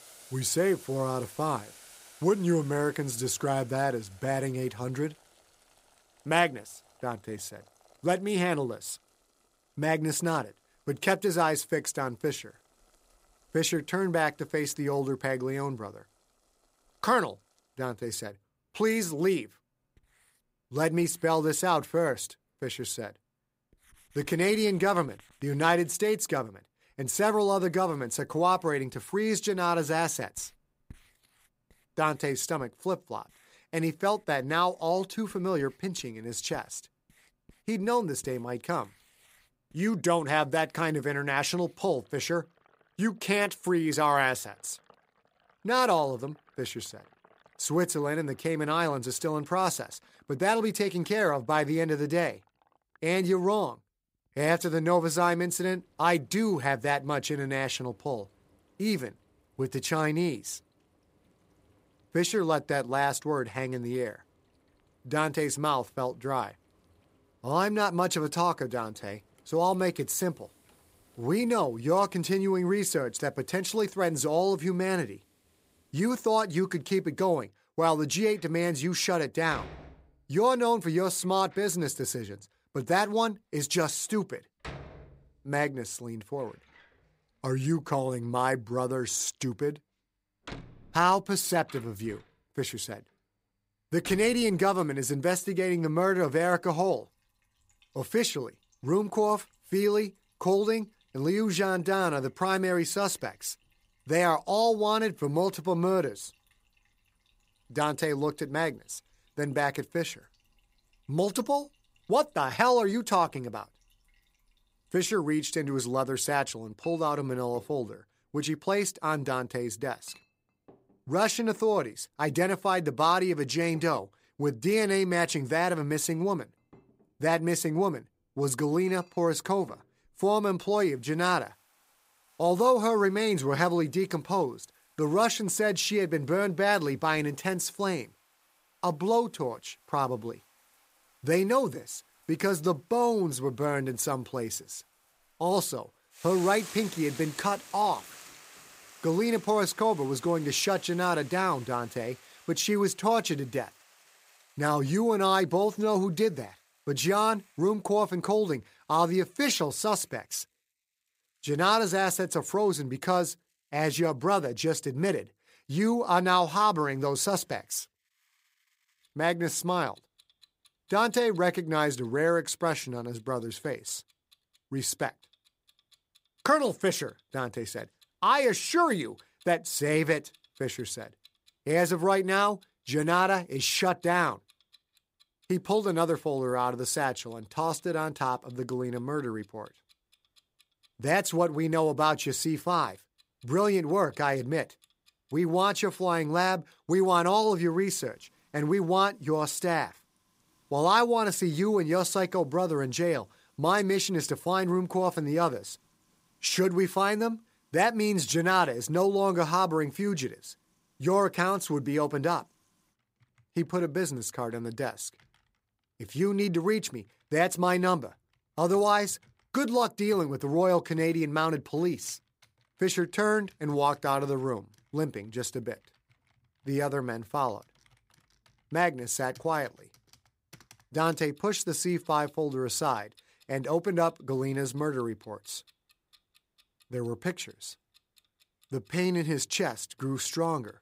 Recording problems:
household noises; faint; throughout; 30 dB below the speech

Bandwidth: 15.5 kHz